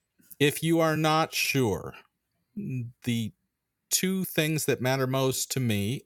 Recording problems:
uneven, jittery; strongly; from 1 to 5.5 s

